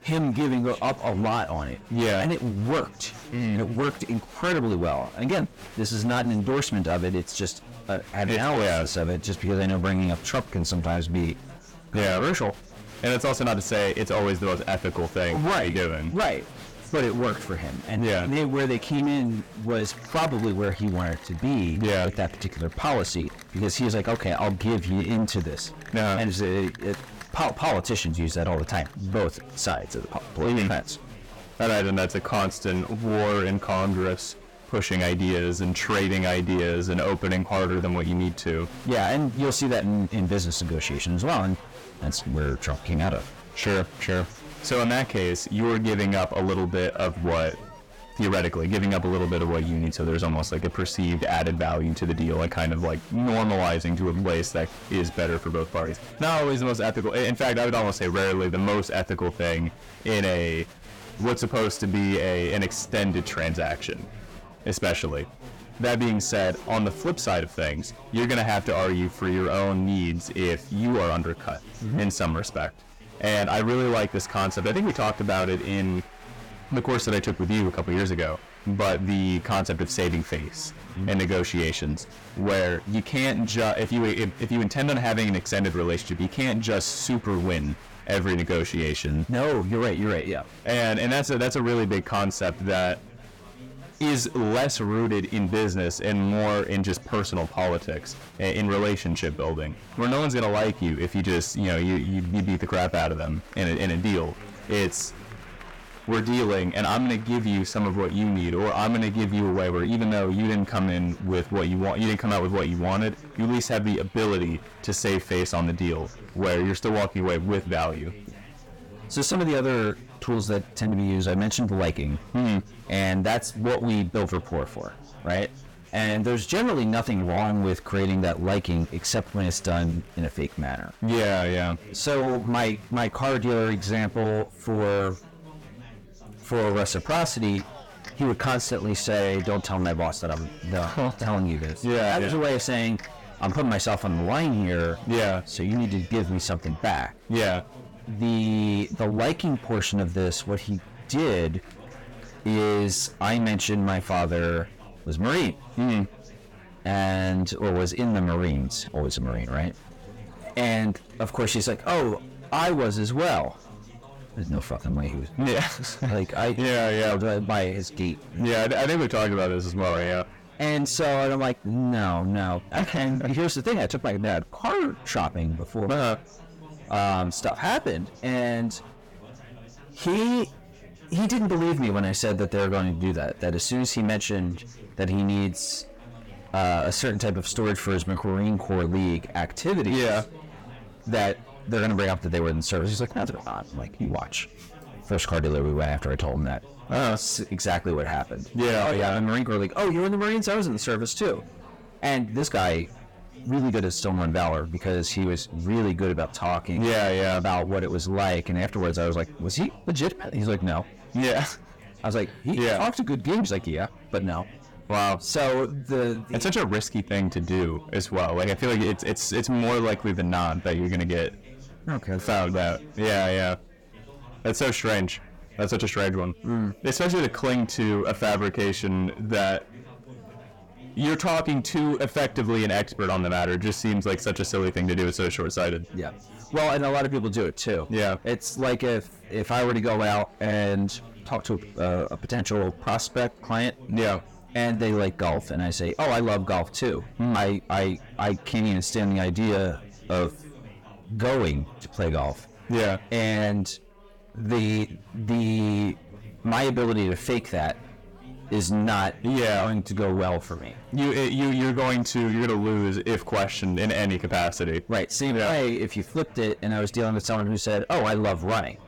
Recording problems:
distortion; heavy; 5 dB below the speech
chatter from many people; noticeable; throughout; 20 dB below the speech

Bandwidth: 17.5 kHz